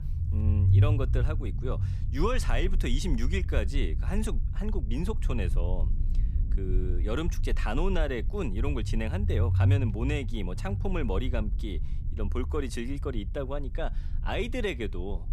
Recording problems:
low rumble; noticeable; throughout; 10 dB below the speech

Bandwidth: 15.5 kHz